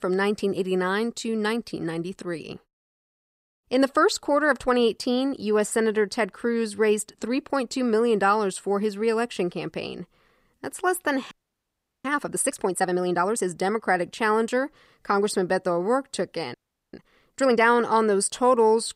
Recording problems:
audio freezing; at 11 s for 0.5 s and at 17 s

